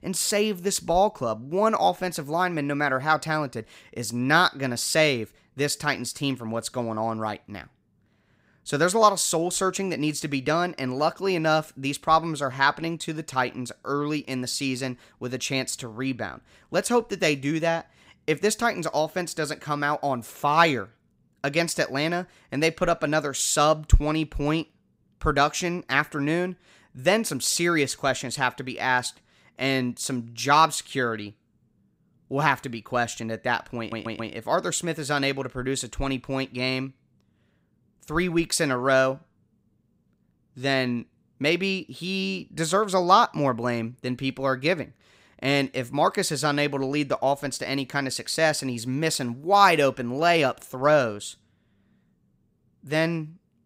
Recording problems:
audio stuttering; at 34 s

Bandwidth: 15.5 kHz